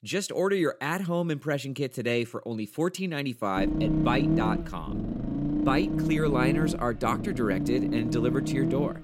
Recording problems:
low rumble; loud; from 3.5 s on; 3 dB below the speech

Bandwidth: 16 kHz